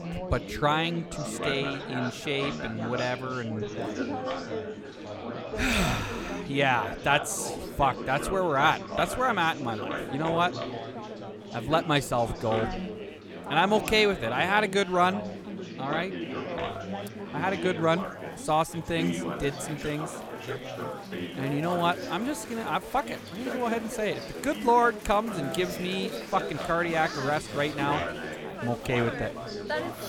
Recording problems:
chatter from many people; loud; throughout; 7 dB below the speech
dog barking; faint; at 20 s; peak 10 dB below the speech

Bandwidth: 17 kHz